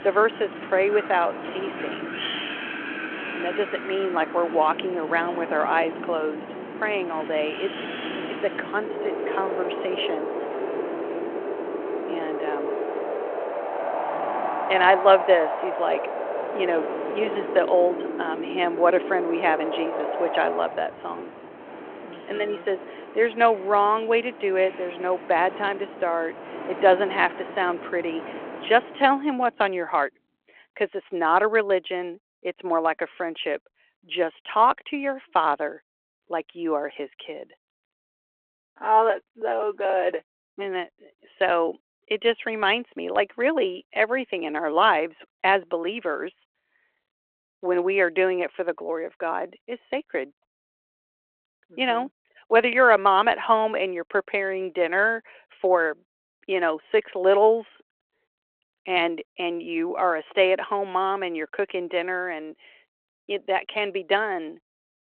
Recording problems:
phone-call audio
wind in the background; loud; until 29 s; 7 dB below the speech

